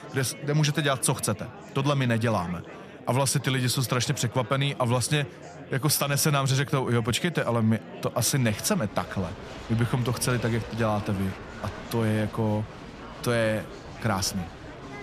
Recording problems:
murmuring crowd; noticeable; throughout; 15 dB below the speech

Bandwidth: 14.5 kHz